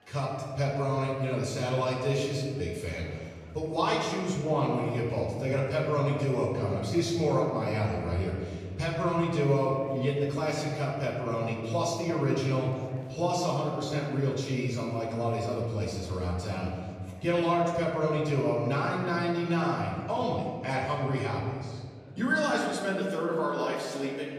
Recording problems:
off-mic speech; far
room echo; noticeable; dies away in 1.7 s
murmuring crowd; faint; throughout; 25 dB below the speech

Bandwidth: 14.5 kHz